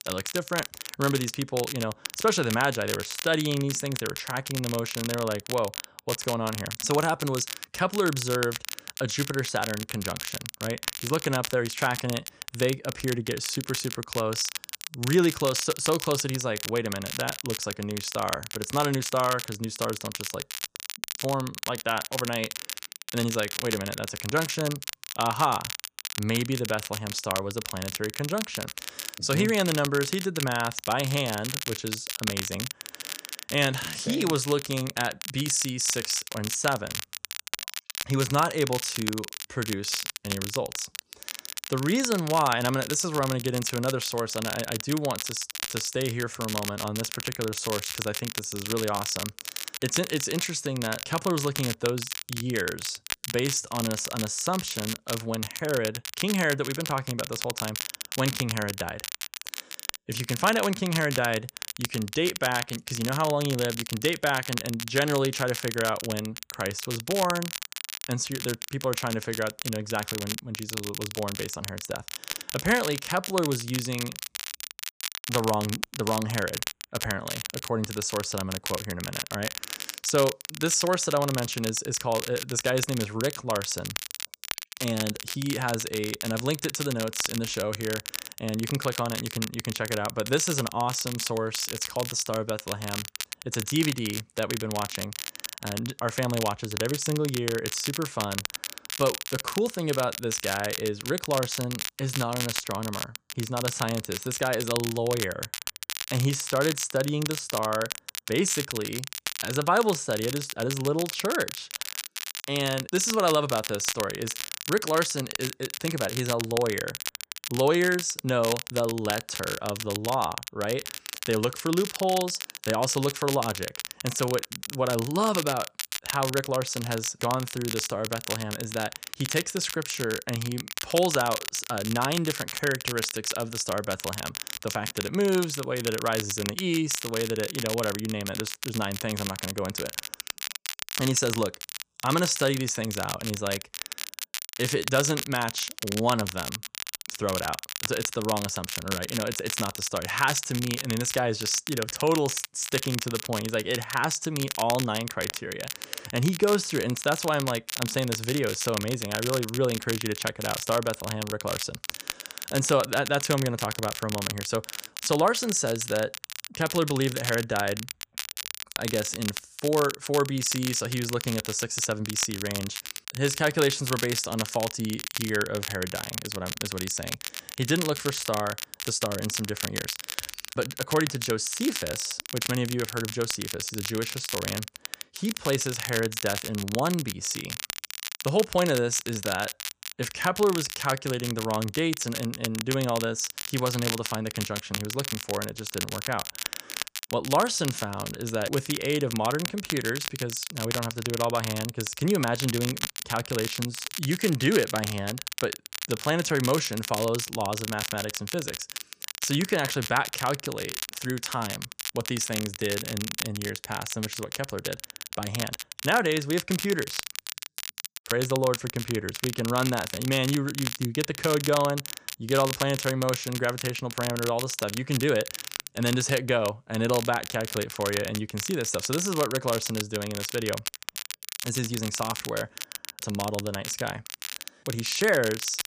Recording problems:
crackle, like an old record; loud; 5 dB below the speech

